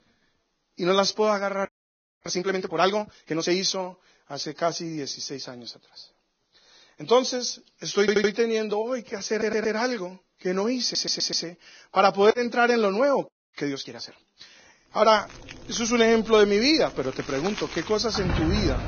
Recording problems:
garbled, watery; badly; nothing above 6.5 kHz
household noises; noticeable; from 15 s on; 10 dB below the speech
audio freezing; at 1.5 s for 0.5 s and at 13 s
audio stuttering; at 8 s, at 9.5 s and at 11 s

